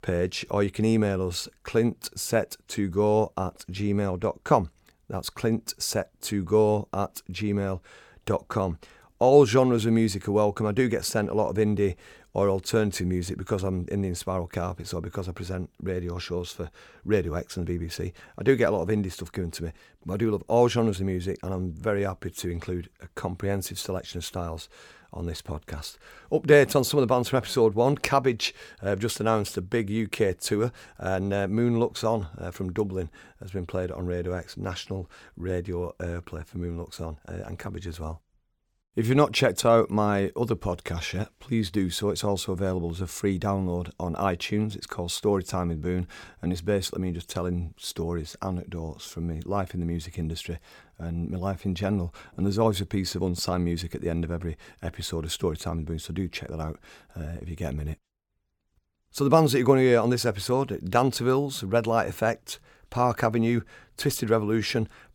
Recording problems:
none

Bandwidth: 17.5 kHz